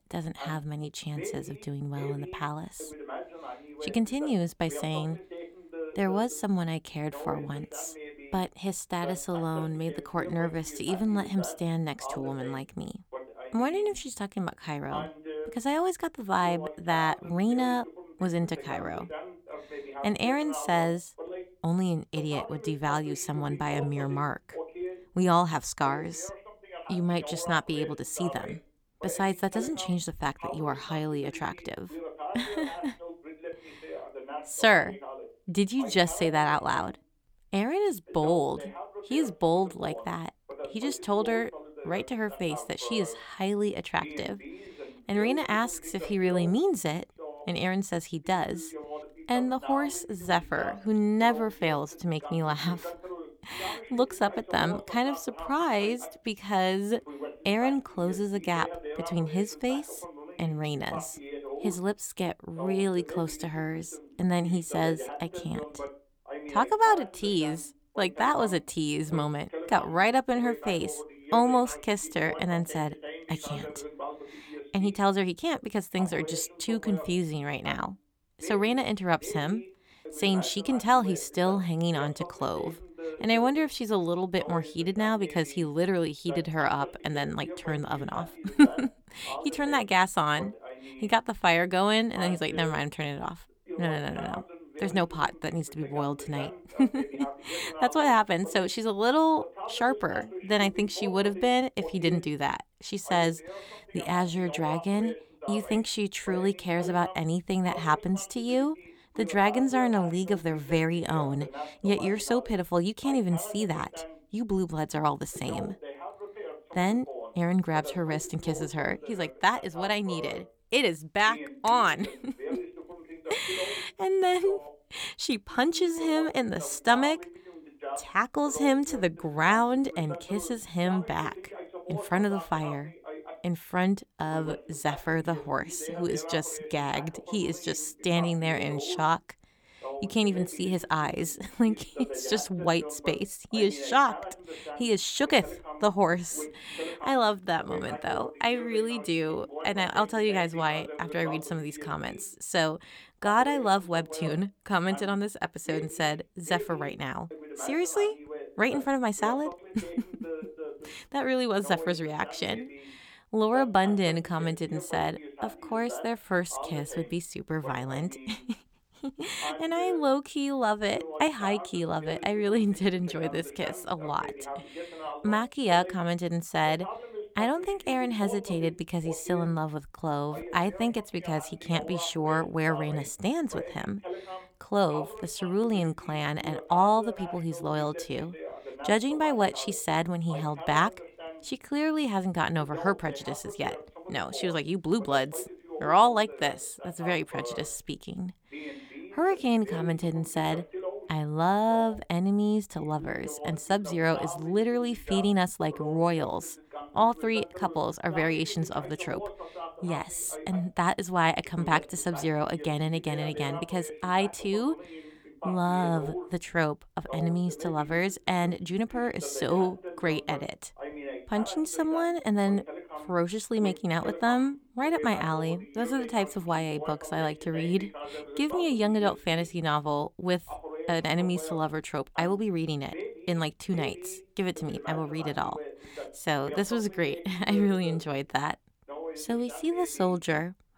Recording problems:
voice in the background; noticeable; throughout; 10 dB below the speech

